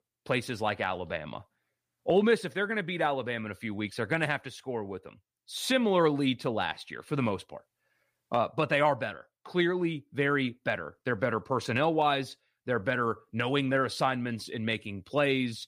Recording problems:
none

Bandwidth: 15 kHz